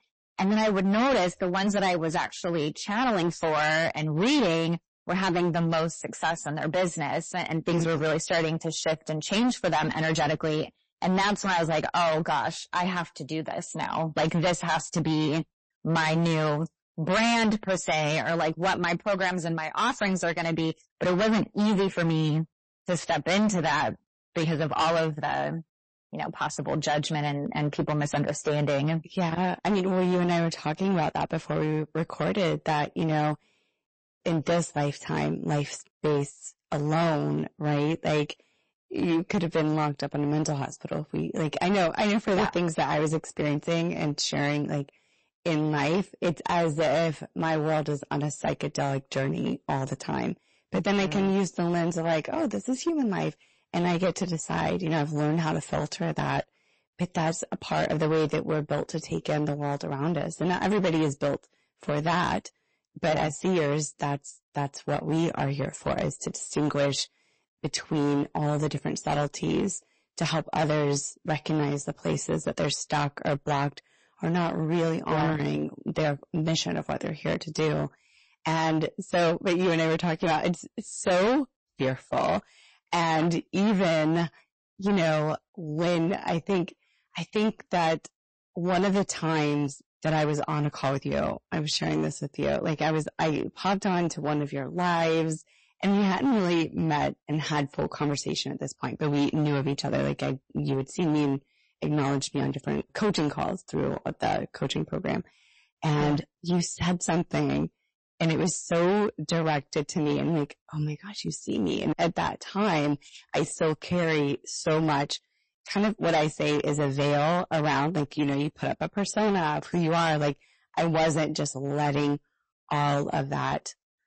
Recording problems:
distortion; heavy; 12% of the sound clipped
garbled, watery; slightly; nothing above 8 kHz

